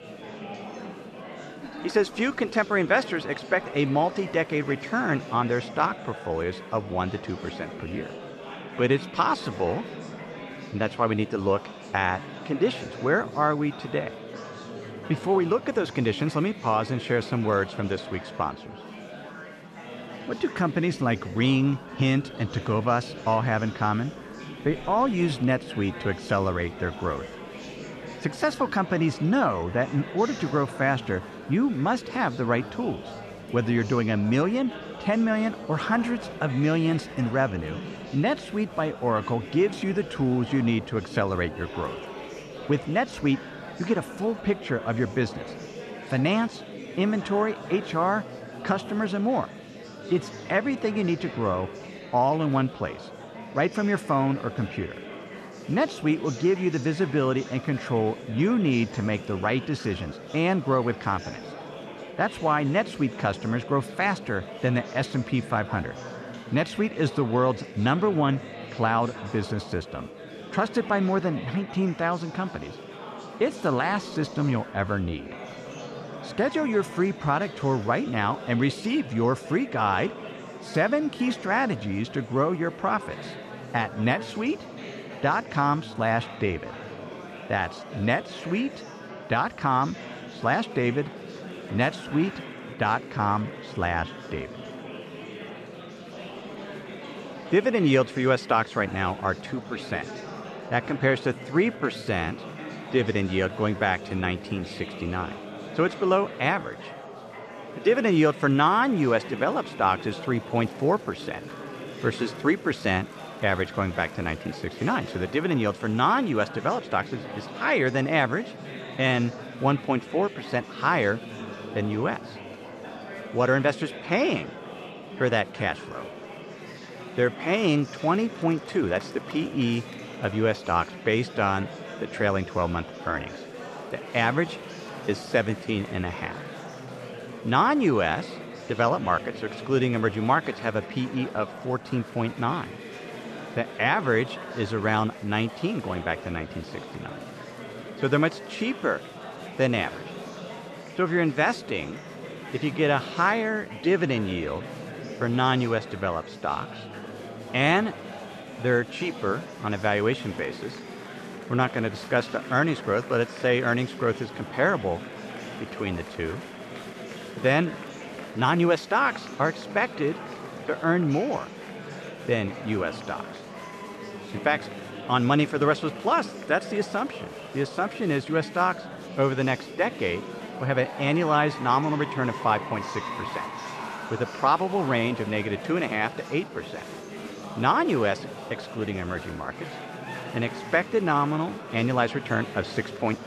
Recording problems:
murmuring crowd; noticeable; throughout; 15 dB below the speech

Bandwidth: 13.5 kHz